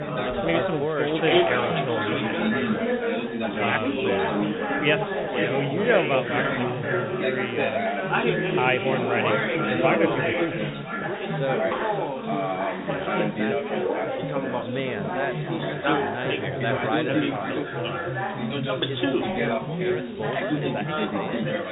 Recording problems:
echo of what is said; strong; throughout; 500 ms later, 7 dB below the speech
high frequencies cut off; severe; nothing above 4 kHz
chatter from many people; very loud; throughout; 3 dB above the speech
hiss; noticeable; throughout; 20 dB below the speech

